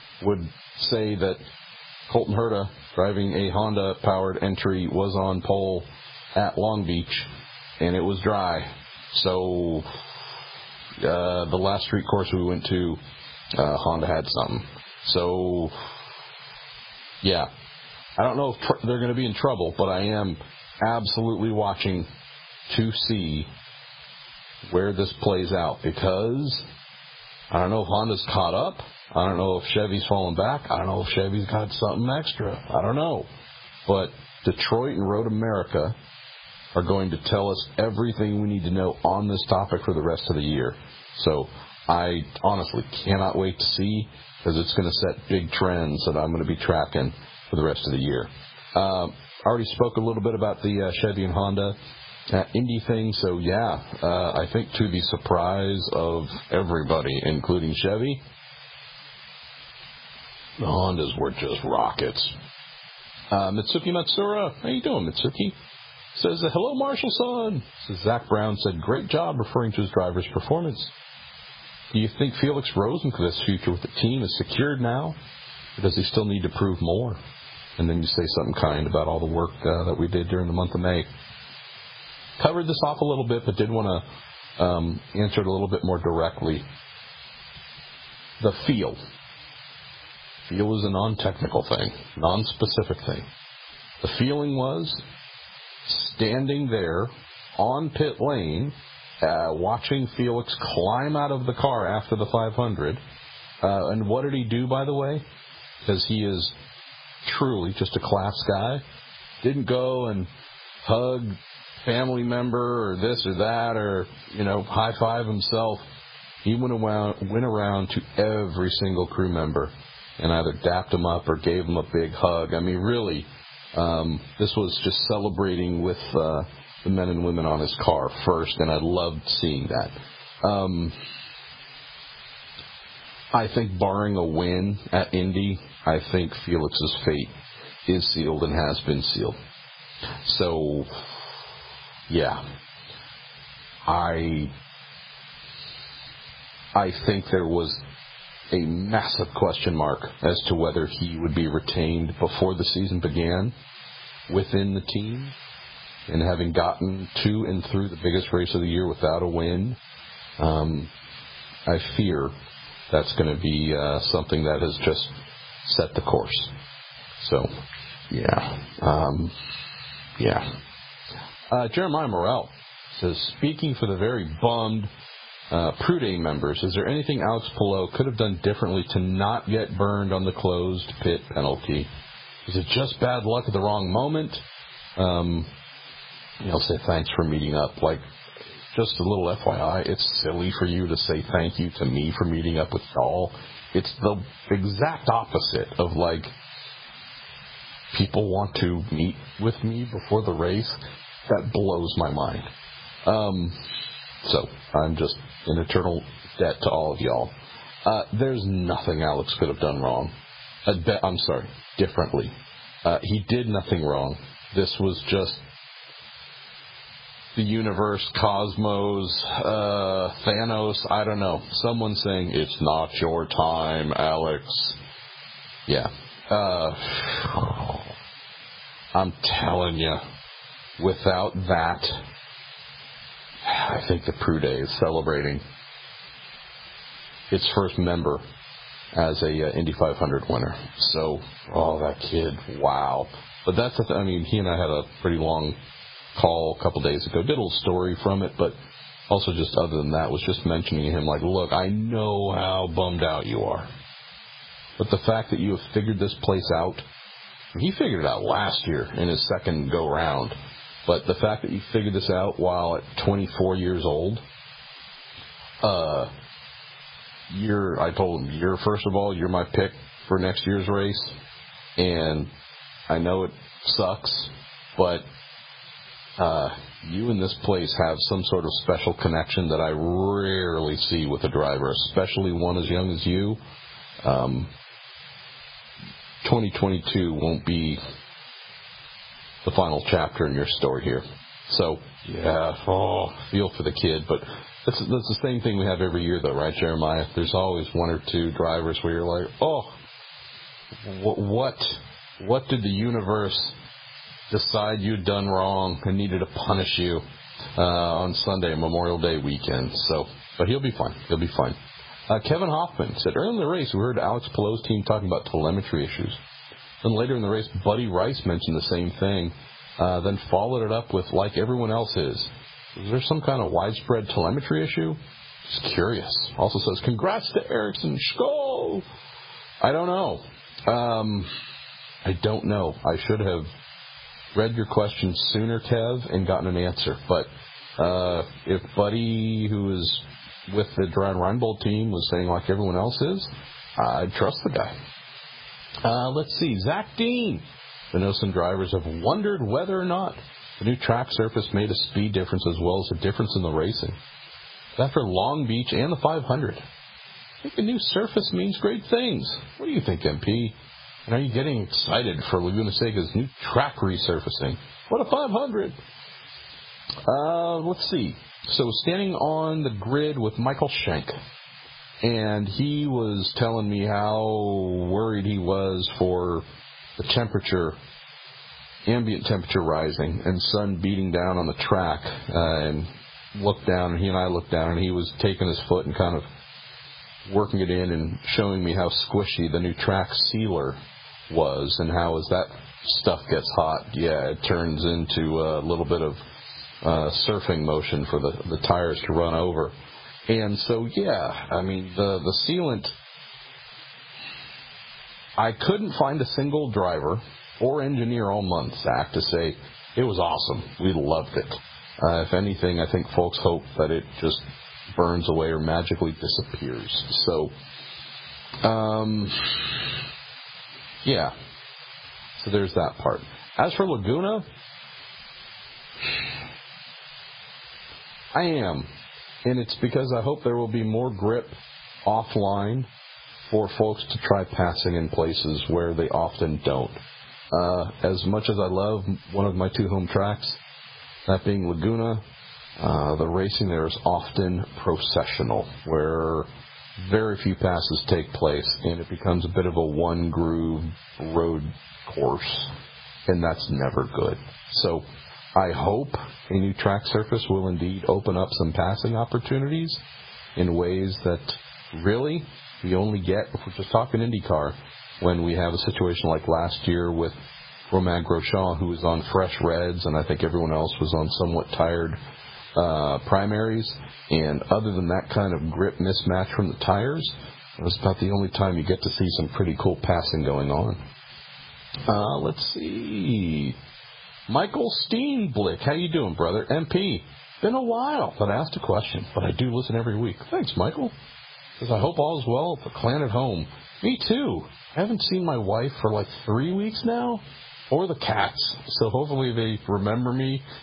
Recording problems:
garbled, watery; badly; nothing above 5 kHz
squashed, flat; somewhat
hiss; faint; throughout; 20 dB below the speech

